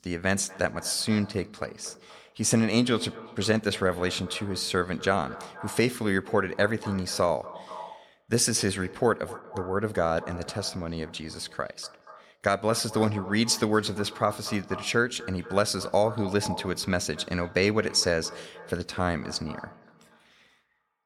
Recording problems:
echo of what is said; noticeable; throughout; 240 ms later, 15 dB below the speech

